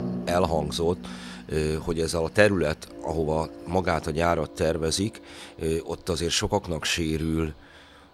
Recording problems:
background music; noticeable; throughout; 15 dB below the speech
machinery noise; faint; throughout; 25 dB below the speech

